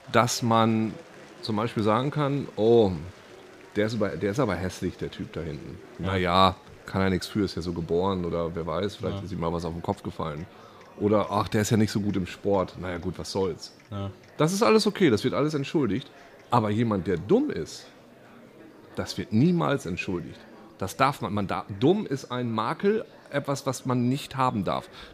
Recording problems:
murmuring crowd; faint; throughout; 25 dB below the speech

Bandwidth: 15 kHz